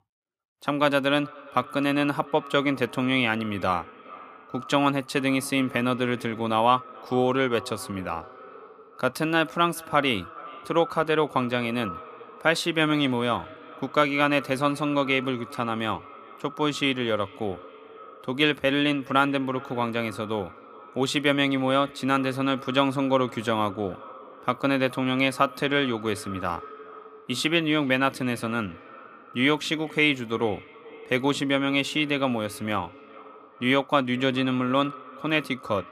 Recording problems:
echo of what is said; faint; throughout; 420 ms later, 20 dB below the speech

